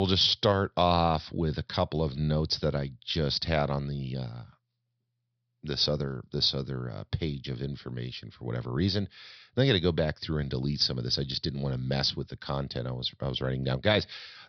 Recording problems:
high frequencies cut off; noticeable; nothing above 5.5 kHz
abrupt cut into speech; at the start

